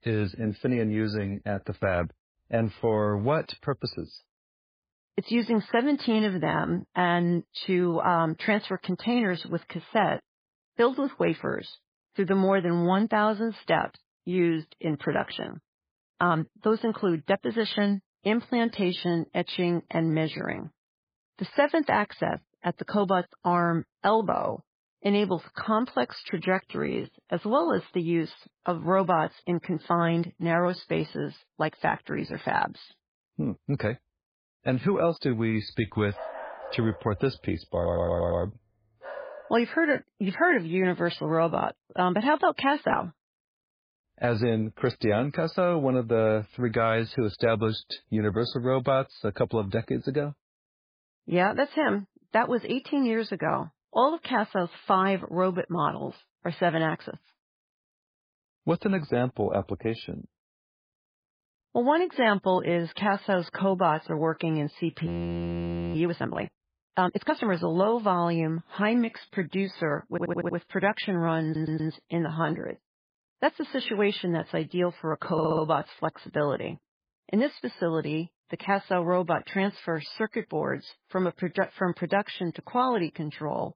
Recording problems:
garbled, watery; badly; nothing above 4.5 kHz
dog barking; faint; from 36 to 40 s; peak 10 dB below the speech
audio stuttering; 4 times, first at 38 s
audio freezing; at 1:05 for 1 s

